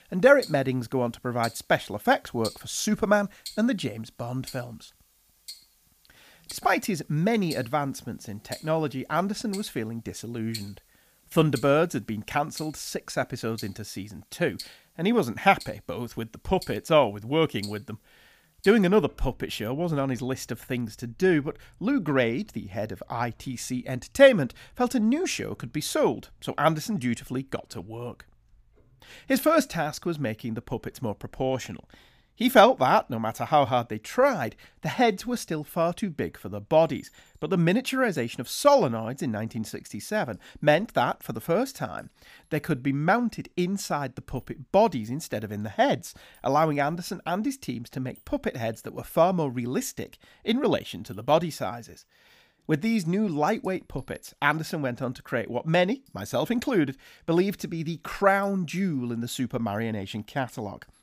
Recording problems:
household noises; noticeable; throughout; 20 dB below the speech

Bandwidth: 15 kHz